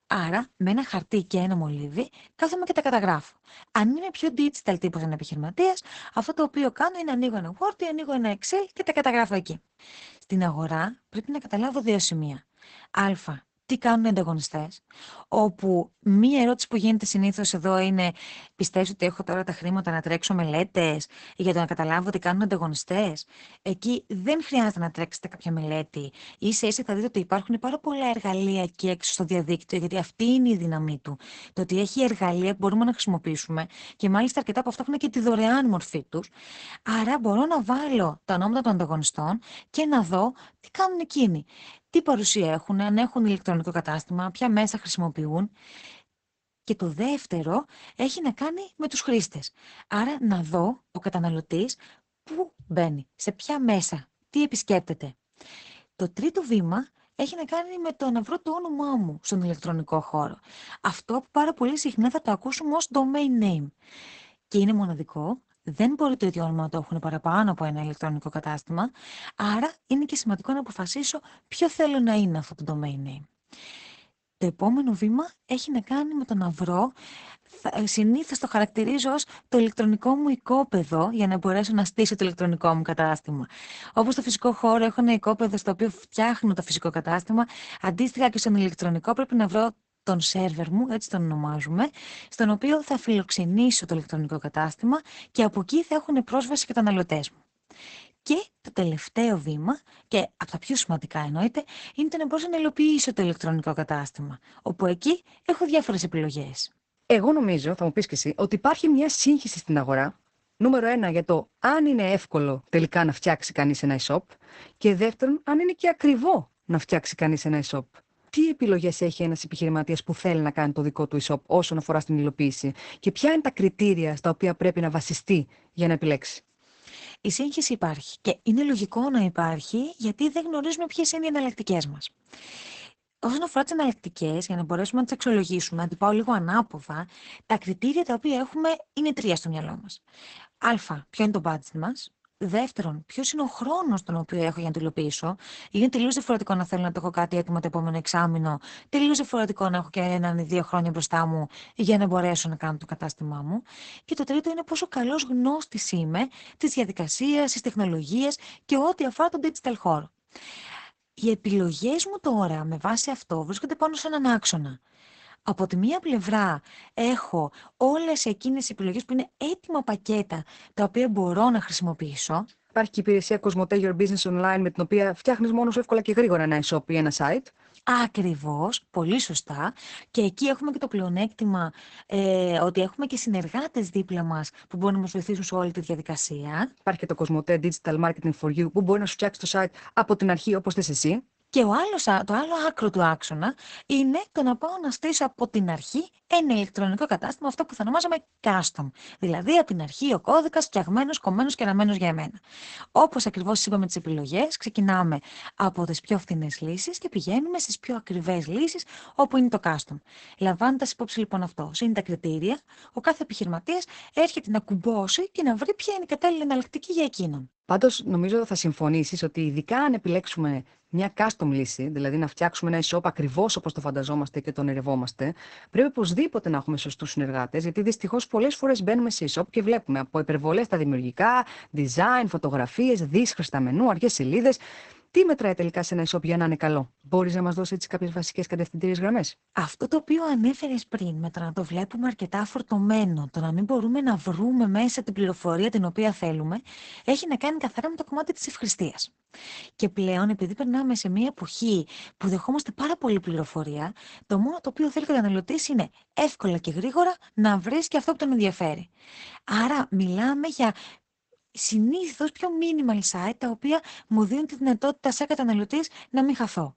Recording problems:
garbled, watery; badly; nothing above 8 kHz

